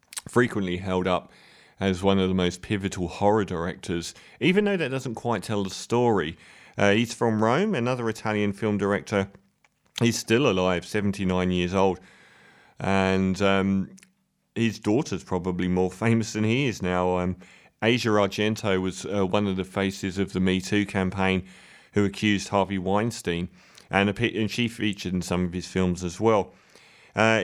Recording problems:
abrupt cut into speech; at the end

